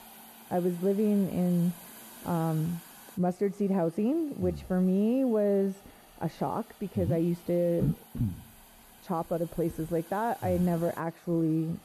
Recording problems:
muffled; very; fading above 1.5 kHz
hiss; faint; throughout; 20 dB below the speech

